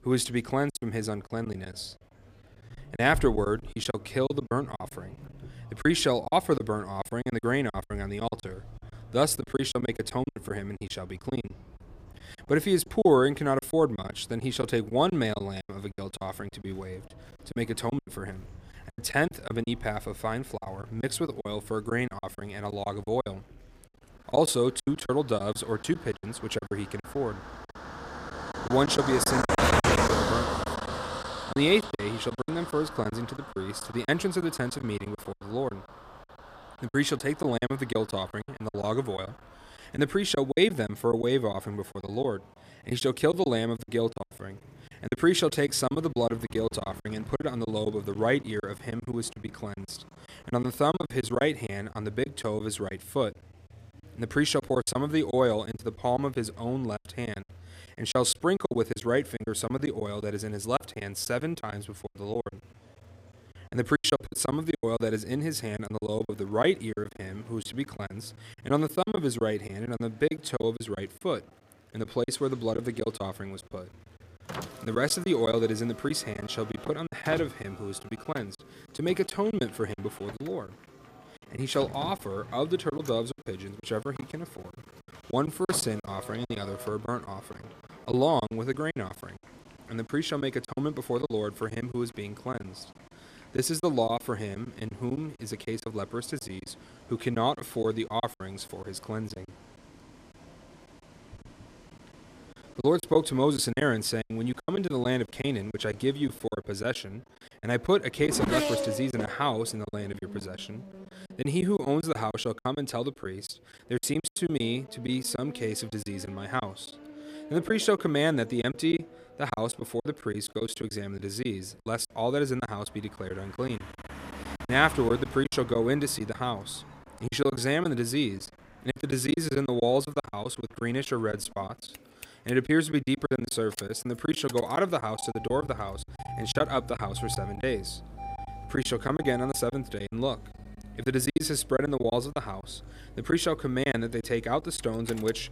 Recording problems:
traffic noise; loud; throughout; 9 dB below the speech
murmuring crowd; faint; throughout; 30 dB below the speech
choppy; very; 11% of the speech affected

